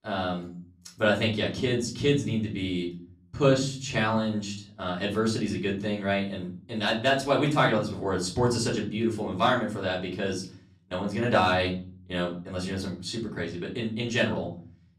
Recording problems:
off-mic speech; far
room echo; slight; dies away in 0.5 s

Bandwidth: 14.5 kHz